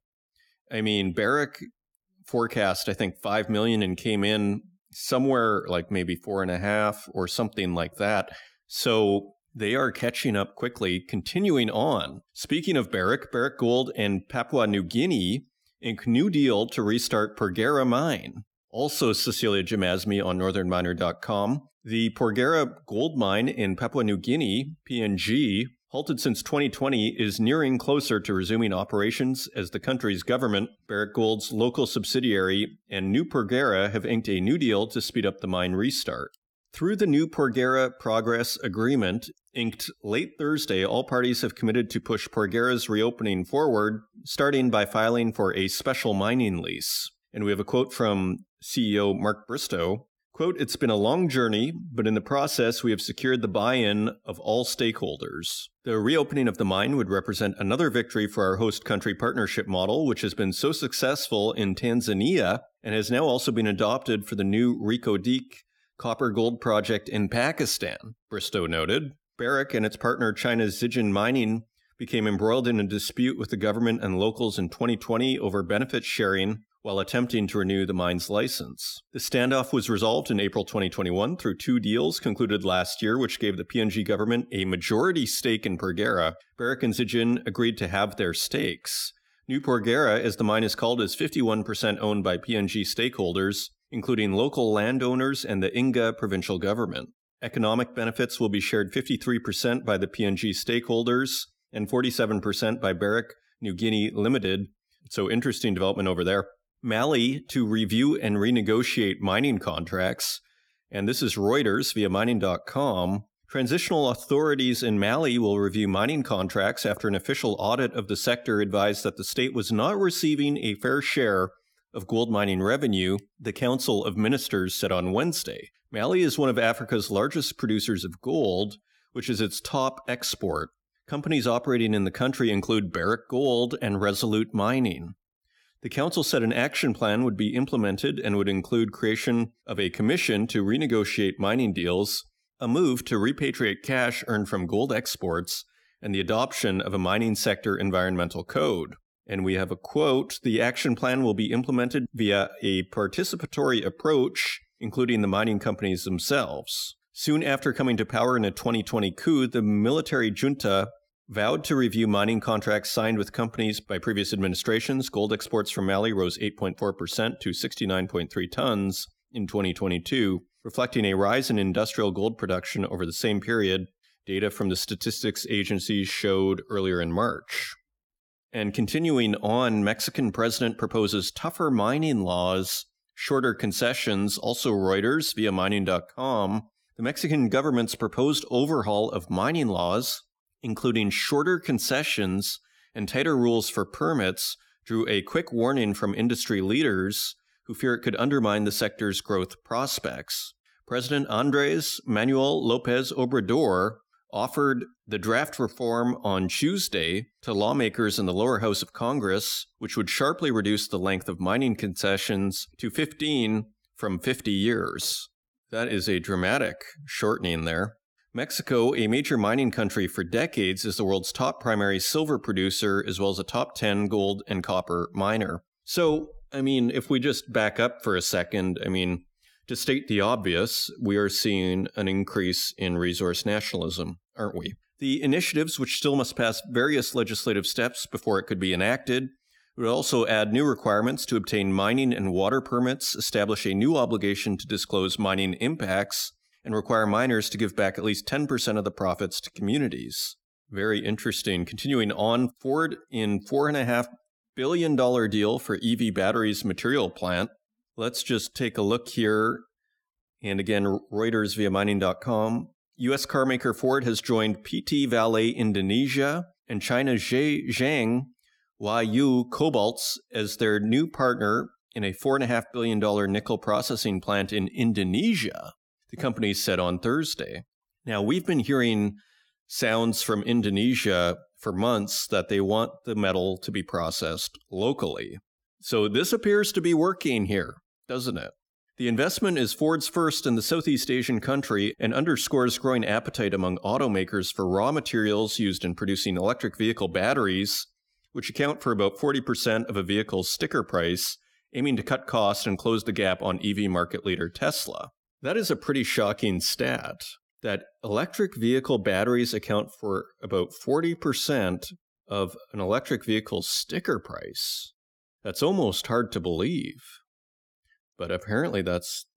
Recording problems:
none

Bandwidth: 18 kHz